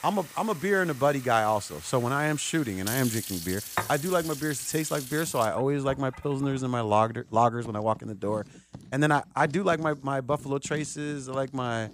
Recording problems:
household noises; noticeable; throughout; 10 dB below the speech

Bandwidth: 15 kHz